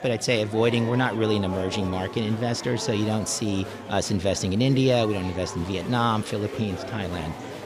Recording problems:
murmuring crowd; noticeable; throughout; 10 dB below the speech

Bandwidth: 15 kHz